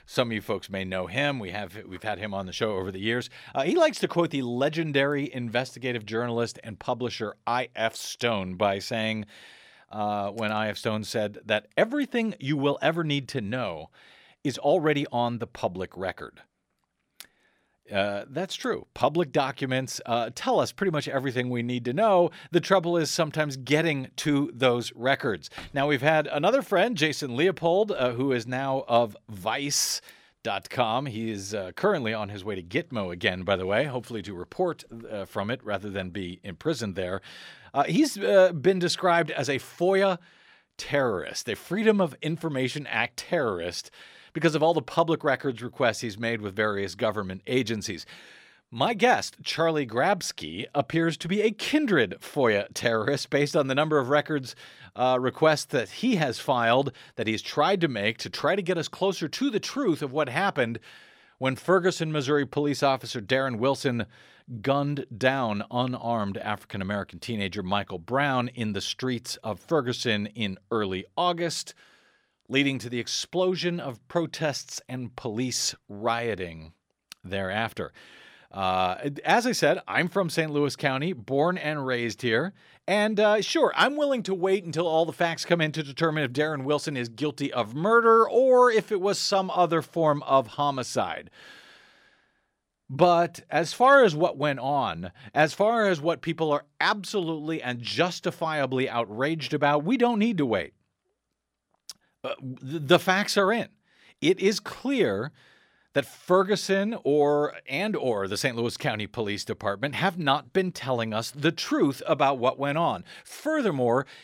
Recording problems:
none

